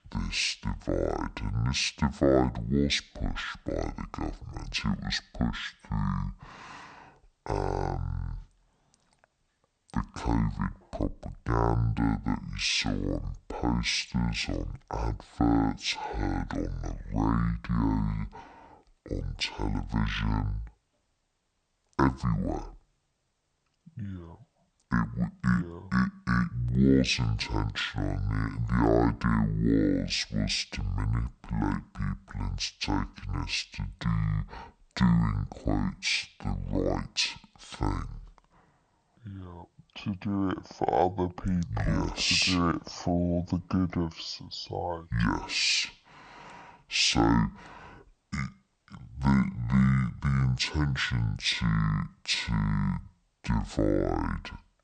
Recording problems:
wrong speed and pitch; too slow and too low; 0.6 times normal speed

